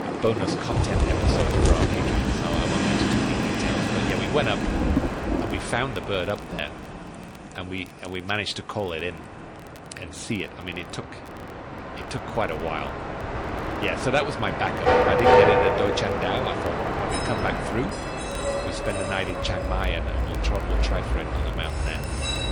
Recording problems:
garbled, watery; slightly; nothing above 10 kHz
rain or running water; very loud; throughout; 1 dB above the speech
train or aircraft noise; very loud; throughout; 4 dB above the speech
crackle, like an old record; faint; 25 dB below the speech

